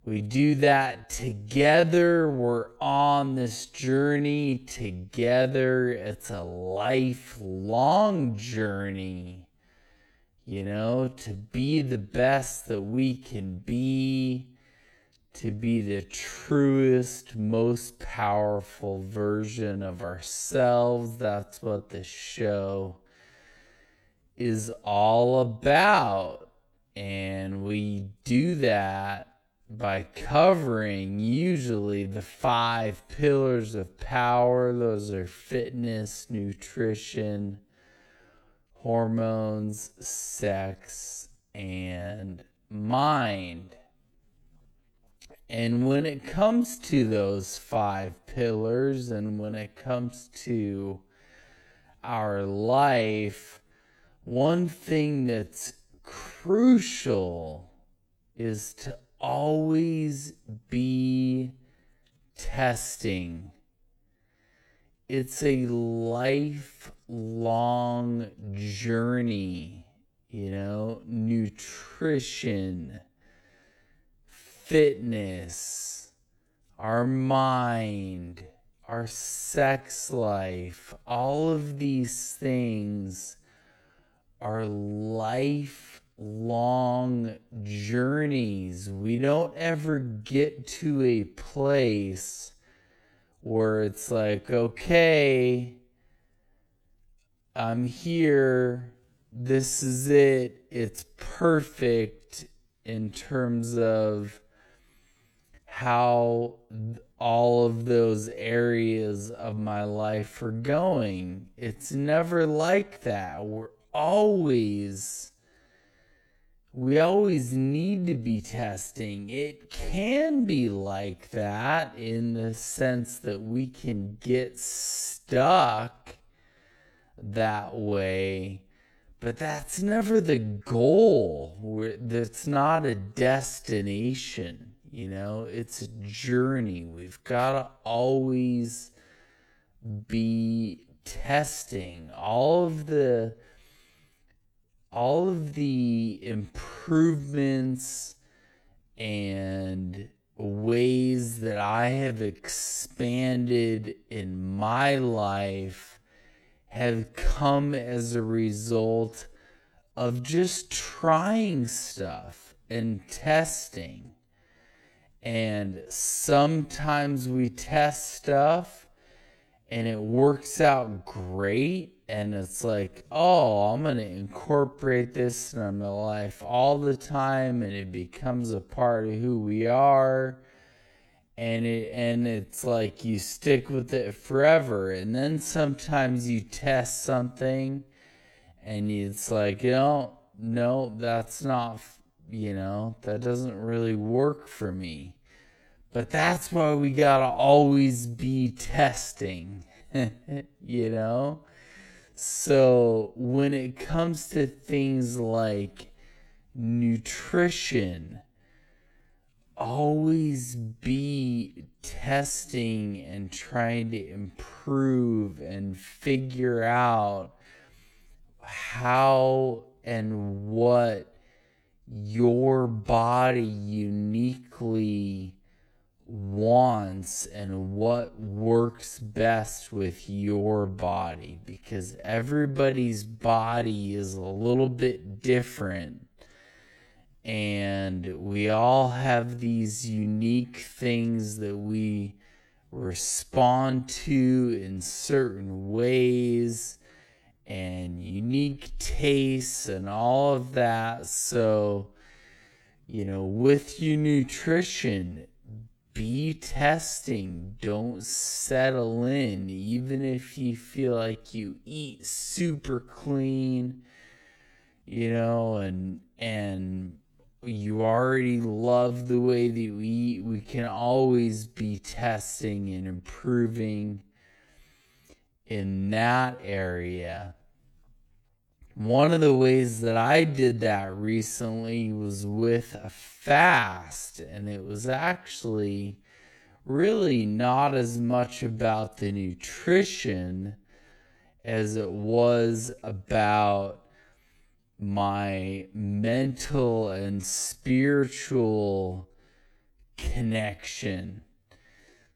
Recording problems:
wrong speed, natural pitch; too slow; 0.5 times normal speed

